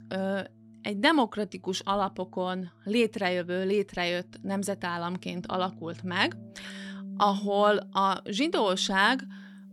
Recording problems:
background music; noticeable; throughout; 20 dB below the speech

